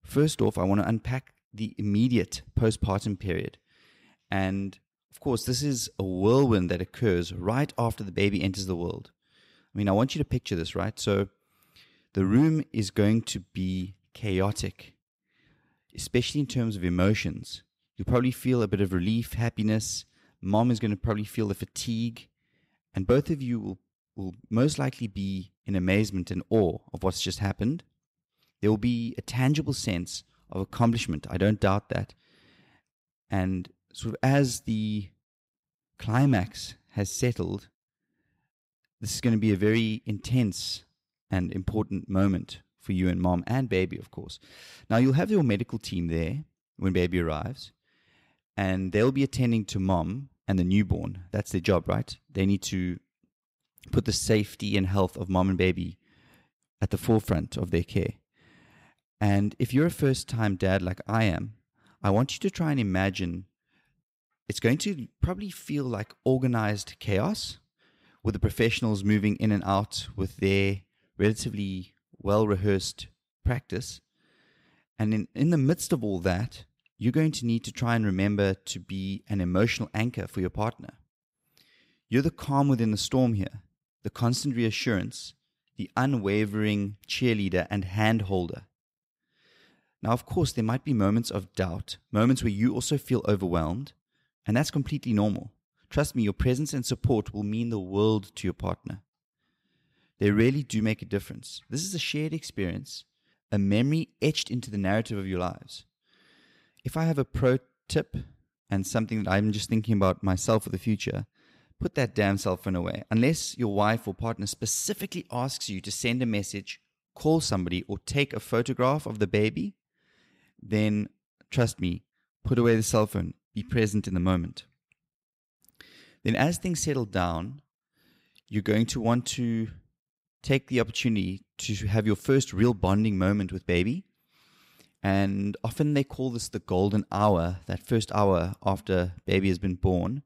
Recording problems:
none

